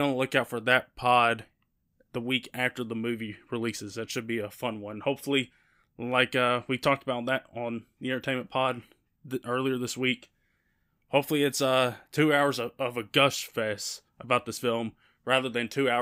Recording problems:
abrupt cut into speech; at the start and the end

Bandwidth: 15.5 kHz